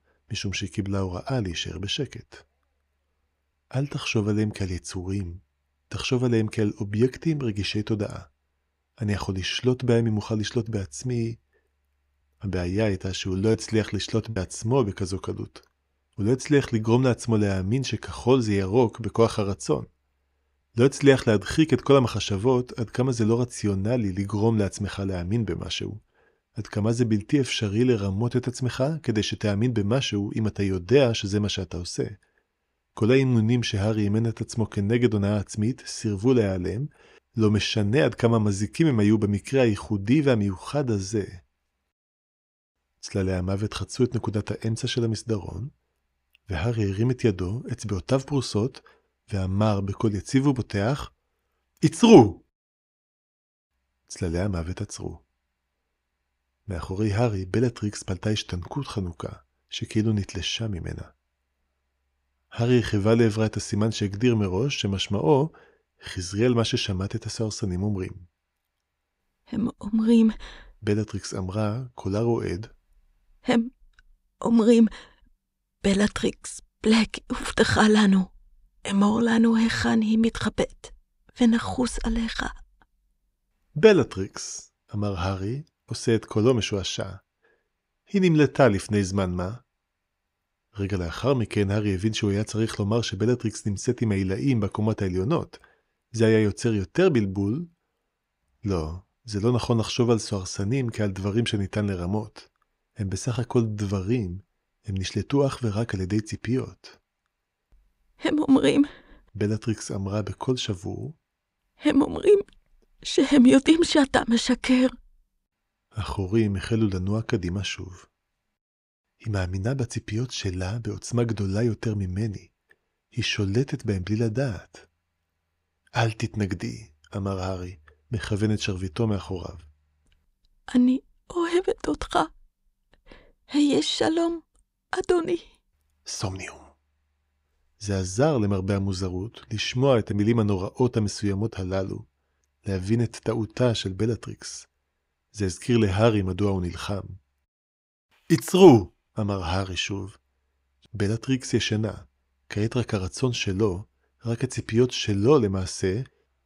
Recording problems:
choppy; occasionally; at 14 s; 2% of the speech affected

